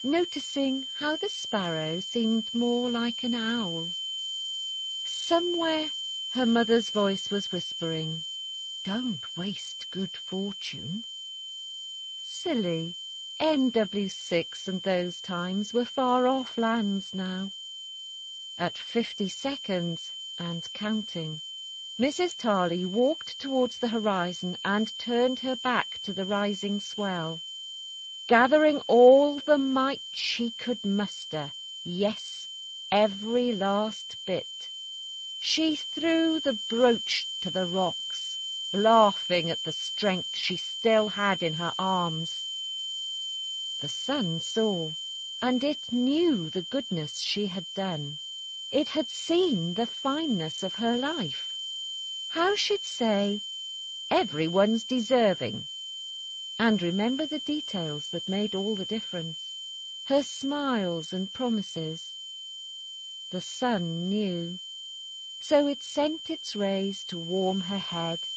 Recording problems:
garbled, watery; slightly; nothing above 7.5 kHz
high-pitched whine; loud; throughout; 3 kHz, 6 dB below the speech

